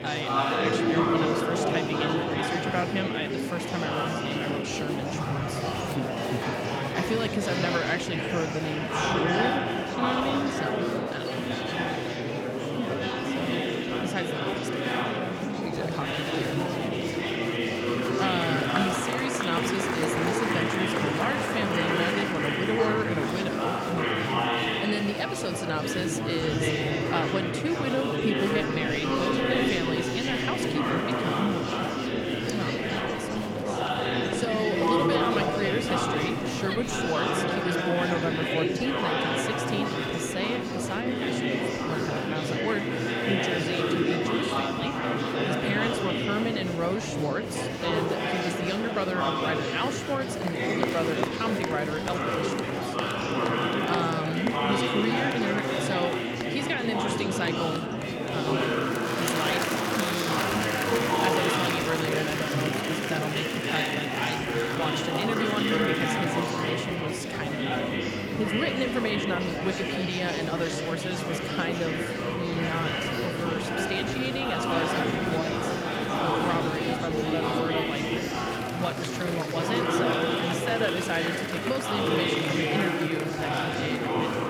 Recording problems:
murmuring crowd; very loud; throughout; 4 dB above the speech

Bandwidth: 17 kHz